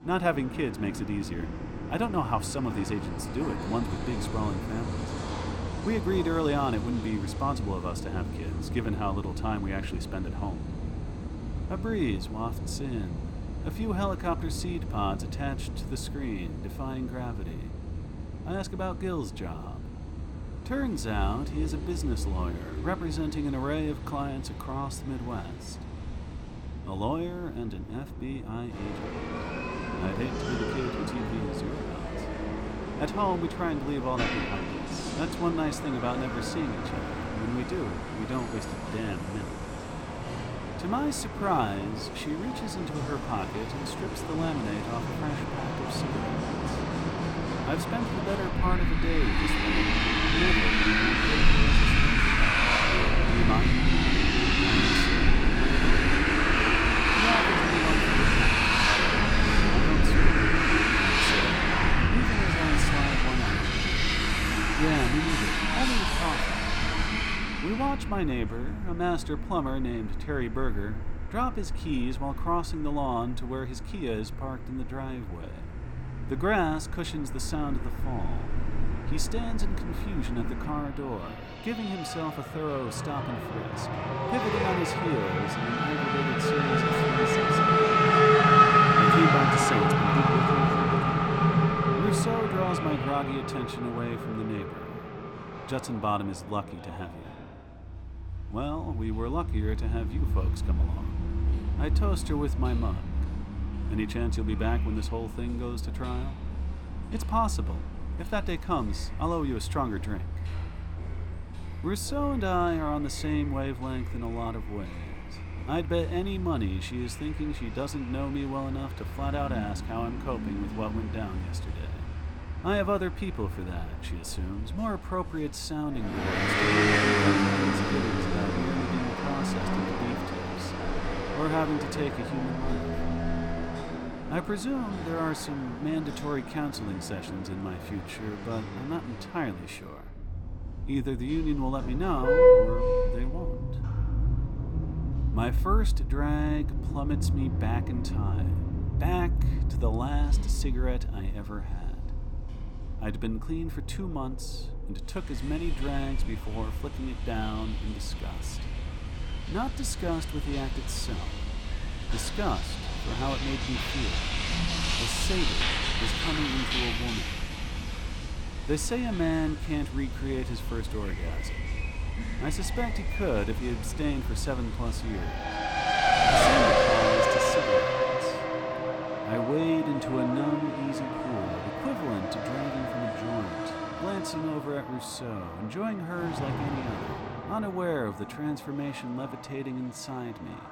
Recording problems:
traffic noise; very loud; throughout; 5 dB above the speech

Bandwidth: 18.5 kHz